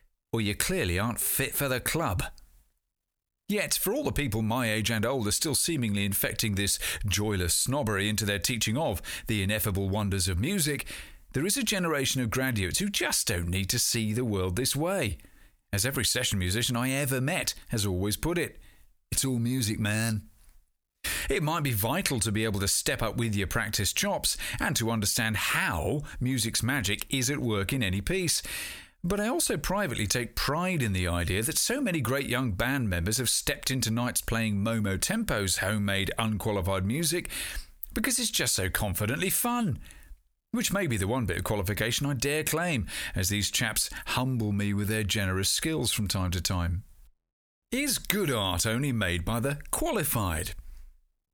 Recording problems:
squashed, flat; heavily

